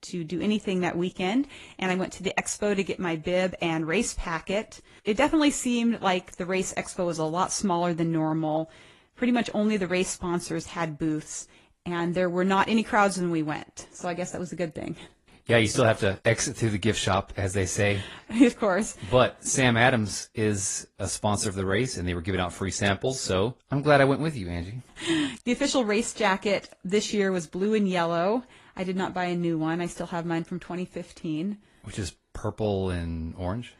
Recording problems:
garbled, watery; slightly; nothing above 11 kHz

